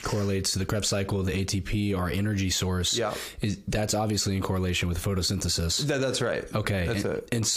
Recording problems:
squashed, flat; heavily
abrupt cut into speech; at the end

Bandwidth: 15 kHz